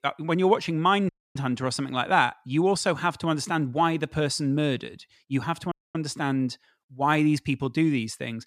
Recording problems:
audio cutting out; at 1 s and at 5.5 s

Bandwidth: 14.5 kHz